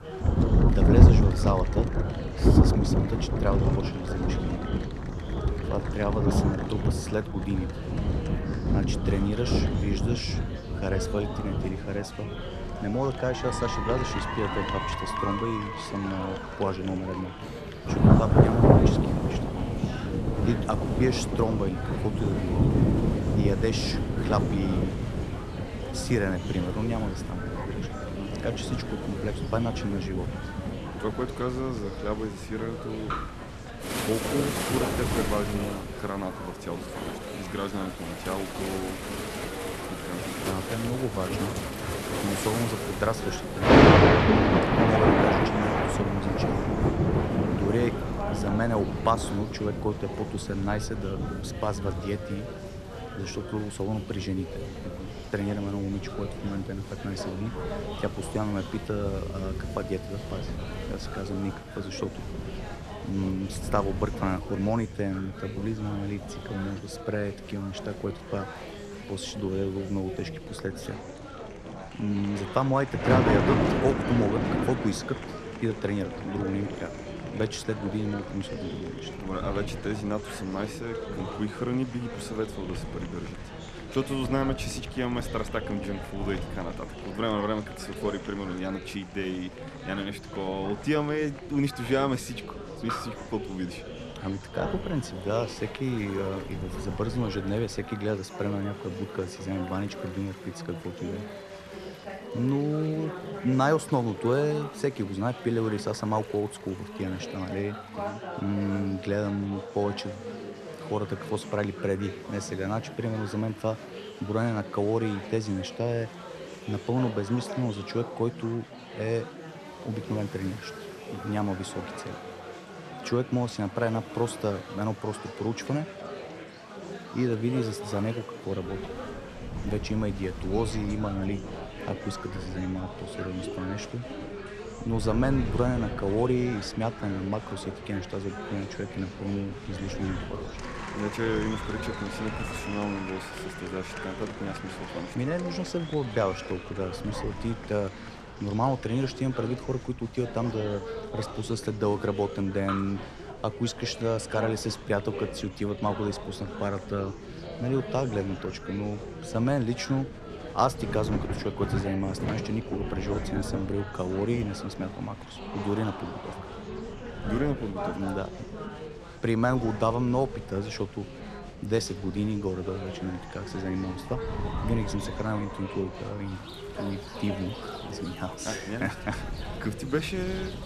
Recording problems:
rain or running water; very loud; throughout; 4 dB above the speech
chatter from many people; loud; throughout; 8 dB below the speech
wind noise on the microphone; occasional gusts; until 1:38 and from 2:09 on; 20 dB below the speech

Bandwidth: 13.5 kHz